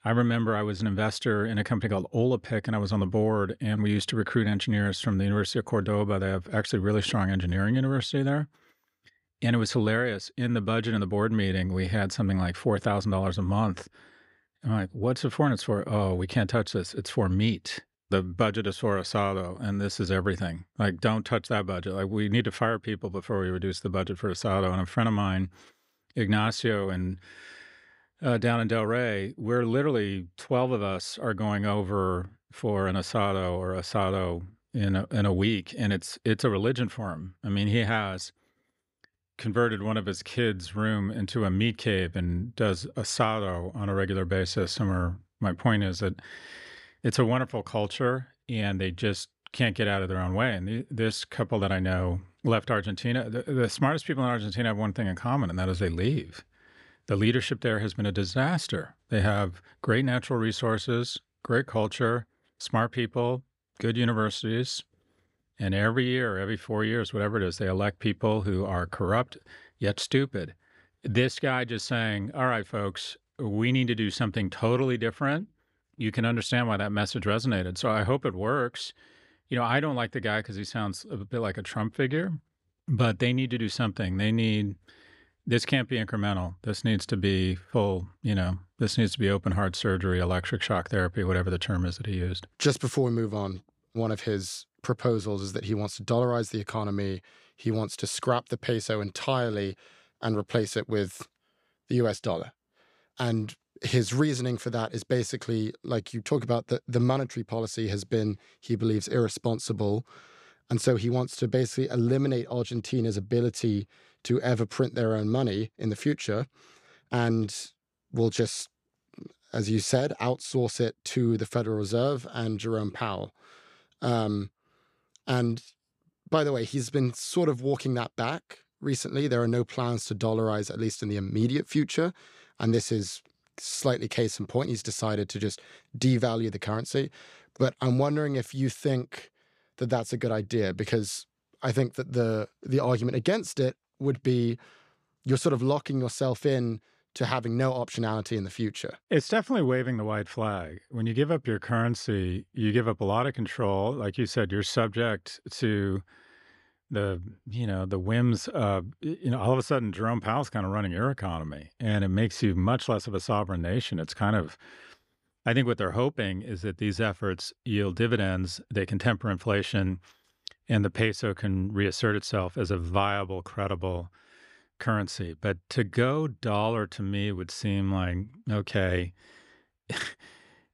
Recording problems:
none

